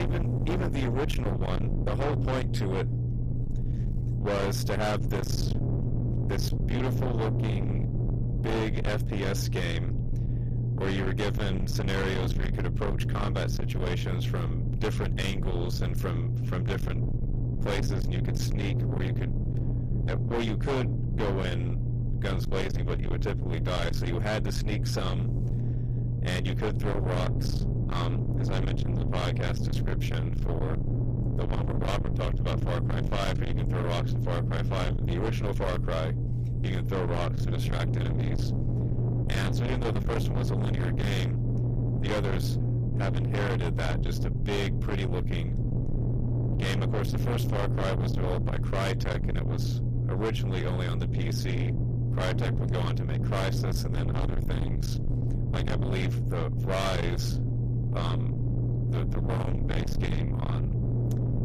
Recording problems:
distortion; heavy; 6 dB below the speech
low rumble; loud; throughout; 5 dB below the speech
abrupt cut into speech; at the start

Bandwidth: 14.5 kHz